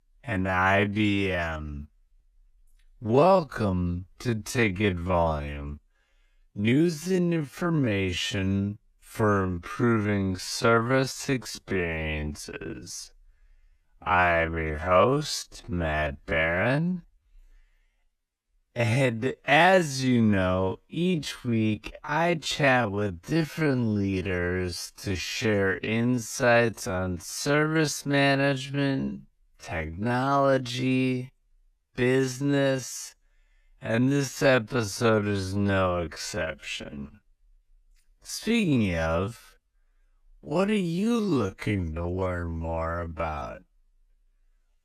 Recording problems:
wrong speed, natural pitch; too slow; 0.5 times normal speed

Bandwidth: 14.5 kHz